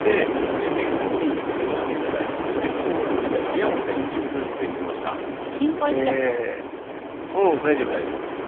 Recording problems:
phone-call audio; poor line; nothing above 3.5 kHz
wind noise on the microphone; heavy; 1 dB below the speech

